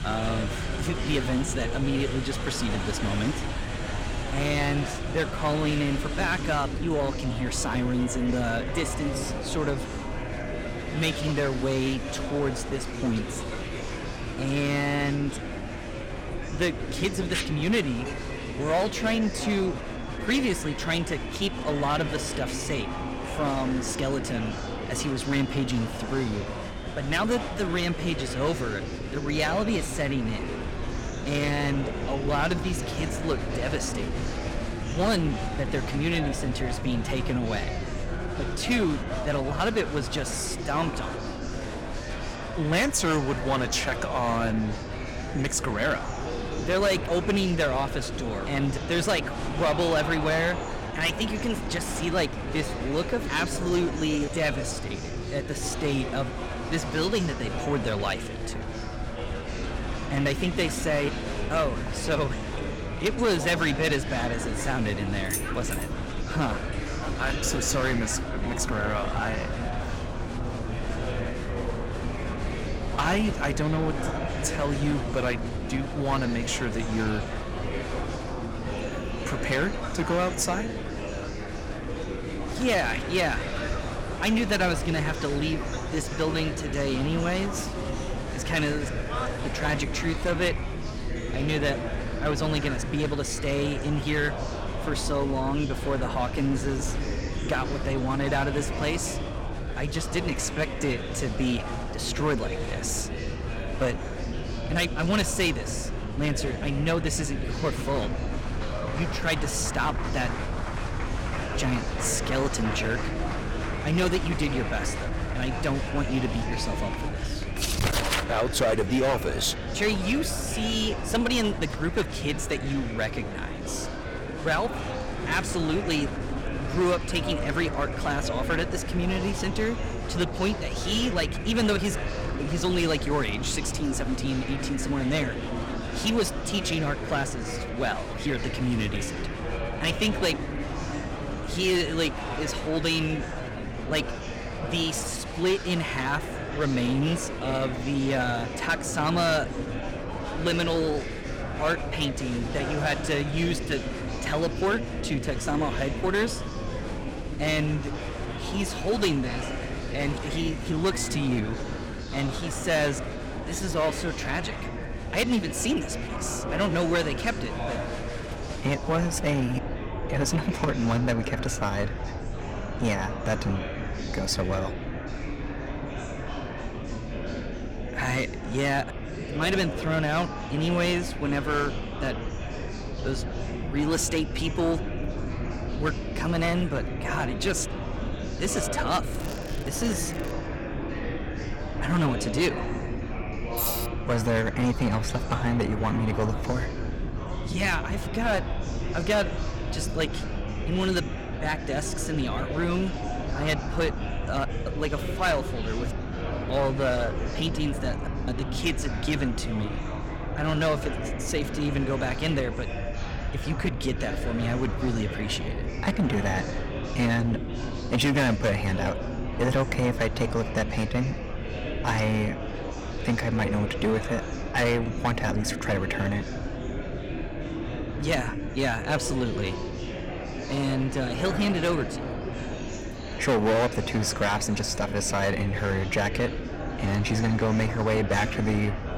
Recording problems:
distortion; slight; 5% of the sound clipped
murmuring crowd; loud; throughout; 7 dB below the speech
crackling; noticeable; from 3:09 to 3:10; 20 dB below the speech
low rumble; faint; throughout; 20 dB below the speech
uneven, jittery; slightly; from 51 s to 2:43
jangling keys; noticeable; at 1:05; peak 4 dB below the speech
jangling keys; loud; at 3:14; peak 1 dB above the speech

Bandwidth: 17 kHz